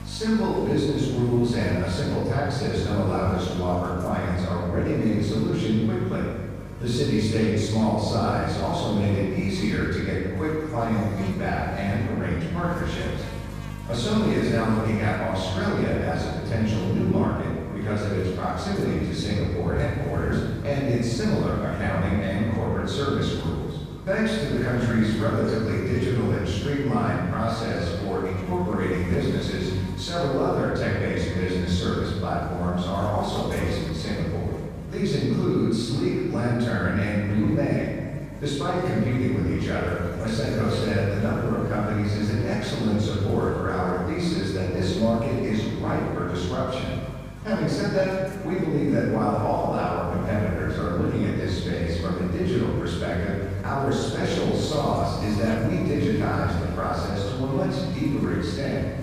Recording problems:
room echo; strong; dies away in 1.5 s
off-mic speech; far
echo of what is said; faint; throughout; 450 ms later, 25 dB below the speech
electrical hum; noticeable; throughout; 50 Hz, 15 dB below the speech

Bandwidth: 15 kHz